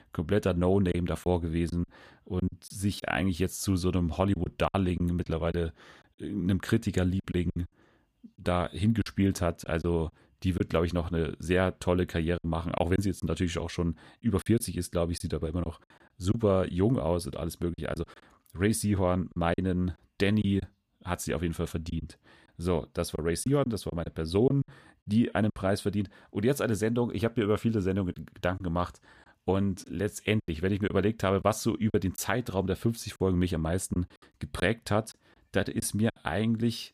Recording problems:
choppy; very; 6% of the speech affected

